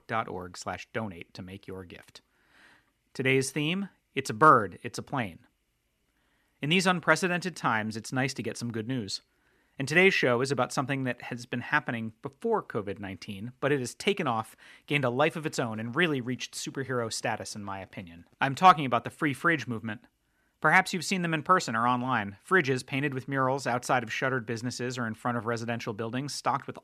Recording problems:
none

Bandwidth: 14.5 kHz